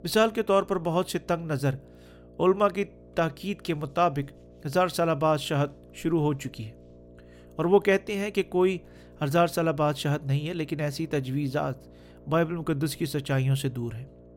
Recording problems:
electrical hum; faint; throughout; 60 Hz, 25 dB below the speech

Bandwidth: 16 kHz